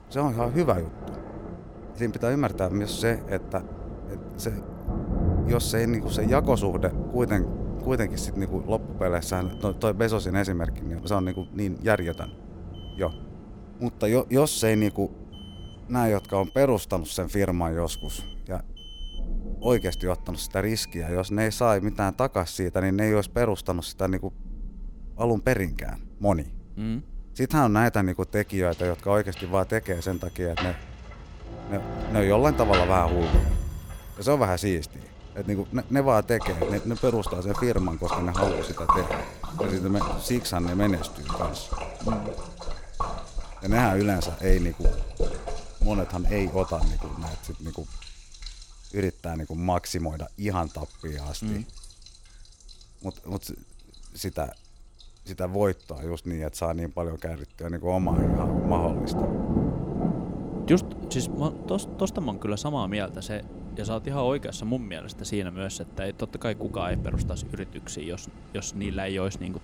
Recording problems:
rain or running water; loud; throughout; 6 dB below the speech
alarms or sirens; faint; throughout; 25 dB below the speech

